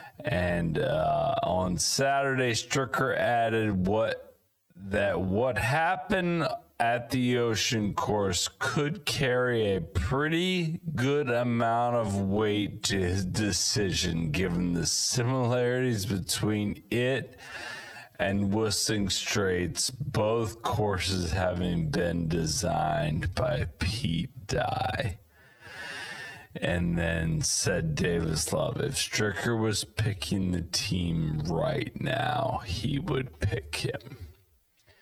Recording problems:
squashed, flat; heavily
wrong speed, natural pitch; too slow; 0.5 times normal speed

